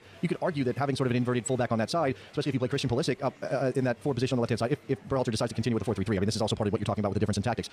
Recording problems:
wrong speed, natural pitch; too fast; 1.7 times normal speed
murmuring crowd; faint; throughout; 25 dB below the speech

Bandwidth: 14.5 kHz